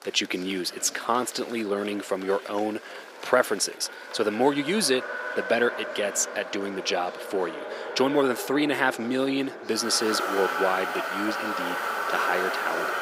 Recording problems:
thin; somewhat; fading below 350 Hz
traffic noise; loud; throughout; 5 dB below the speech
murmuring crowd; noticeable; throughout; 15 dB below the speech

